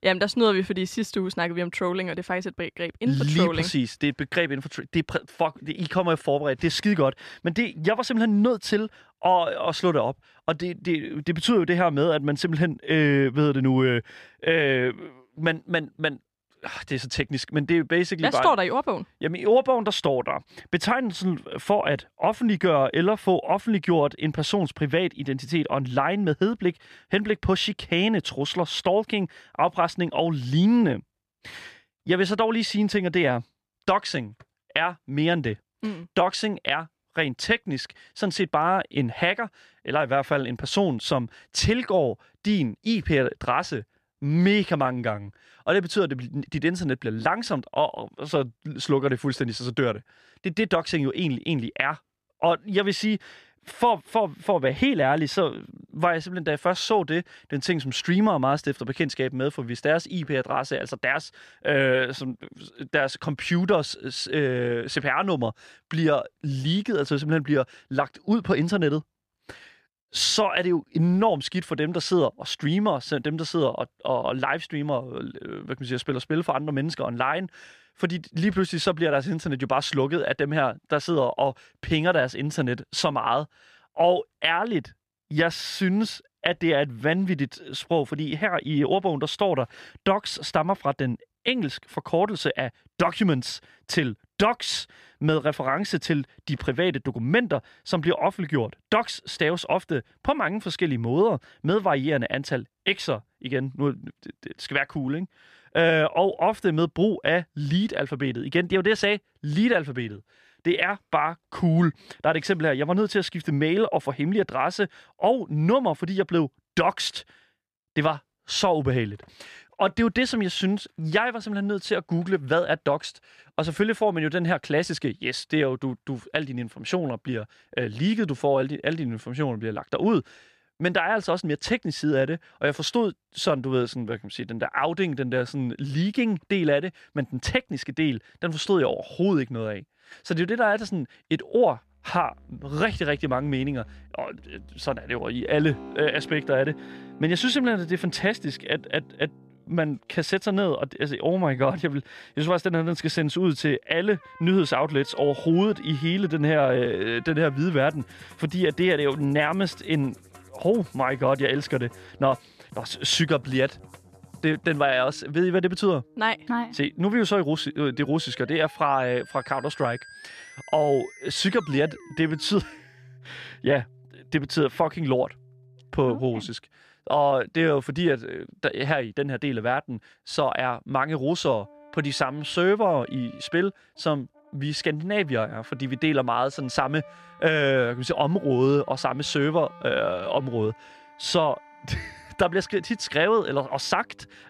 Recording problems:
background music; faint; from 2:22 on; 25 dB below the speech

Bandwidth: 14.5 kHz